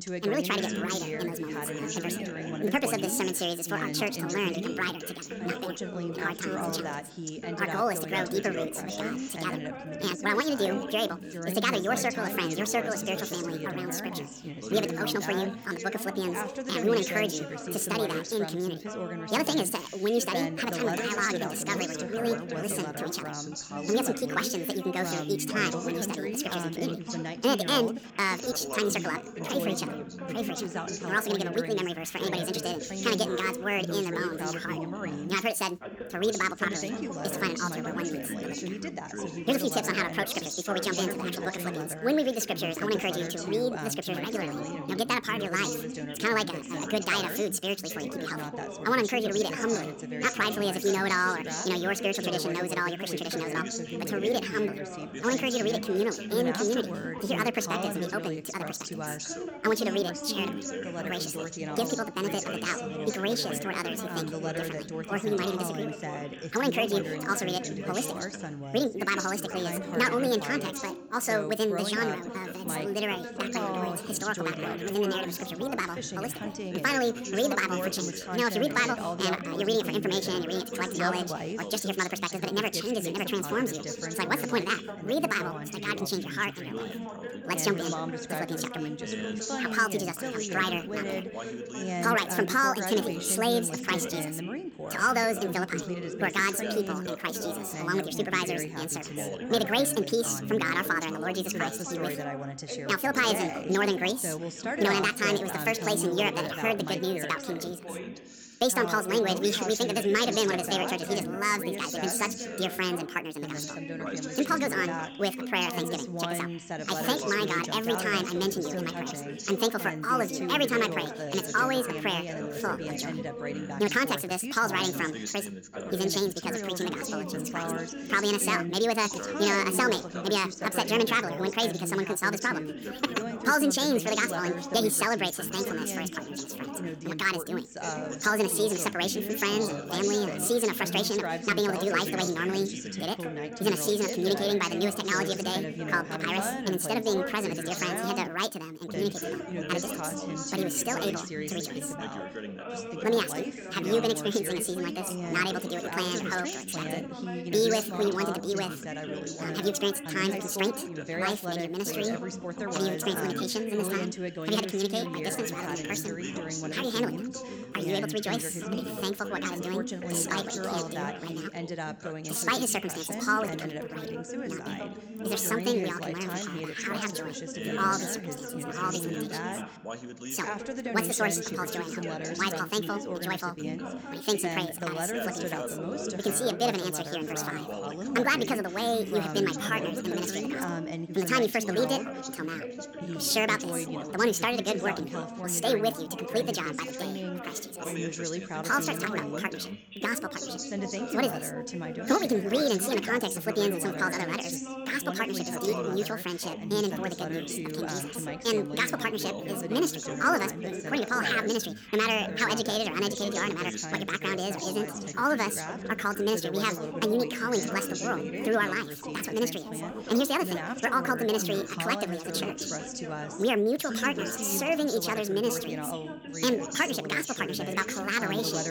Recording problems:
wrong speed and pitch; too fast and too high; 1.7 times normal speed
background chatter; loud; throughout; 3 voices, 5 dB below the speech

